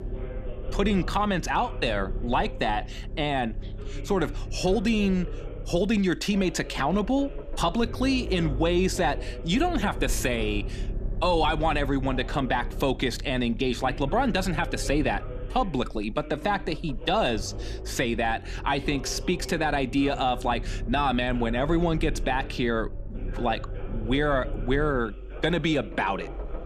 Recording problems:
voice in the background; noticeable; throughout; 15 dB below the speech
low rumble; faint; throughout; 20 dB below the speech

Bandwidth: 14.5 kHz